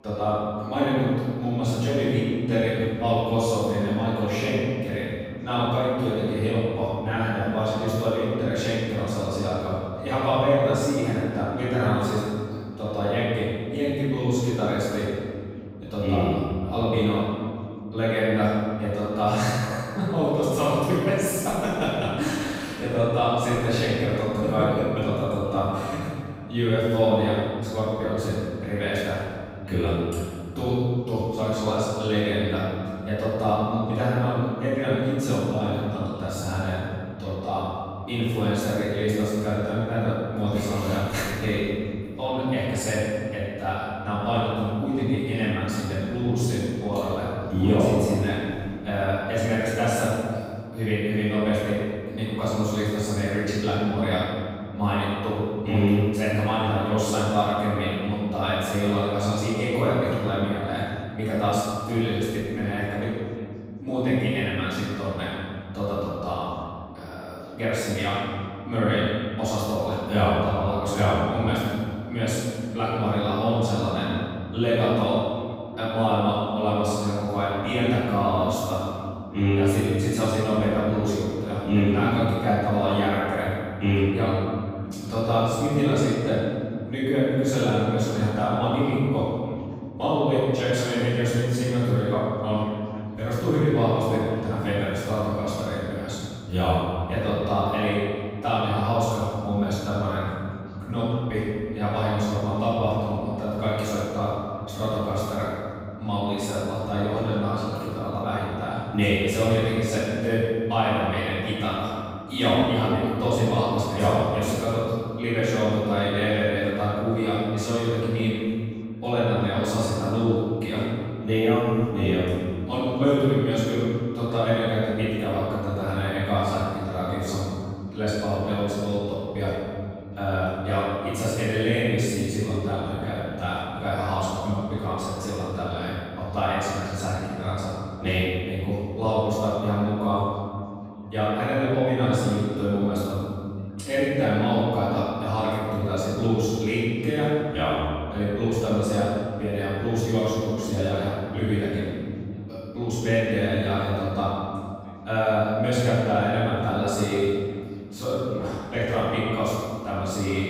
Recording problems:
room echo; strong; dies away in 2.3 s
off-mic speech; far
background chatter; faint; throughout; 4 voices, 30 dB below the speech

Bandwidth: 15.5 kHz